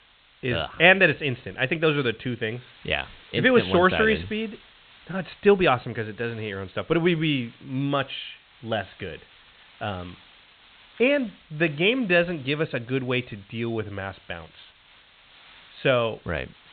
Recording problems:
high frequencies cut off; severe; nothing above 4 kHz
hiss; faint; throughout; 25 dB below the speech

